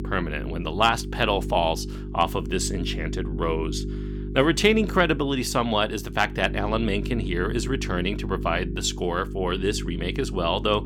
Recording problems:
electrical hum; noticeable; throughout; 50 Hz, 15 dB below the speech

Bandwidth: 17.5 kHz